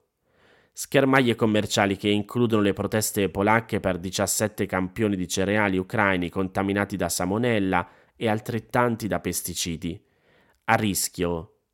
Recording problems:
none

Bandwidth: 16.5 kHz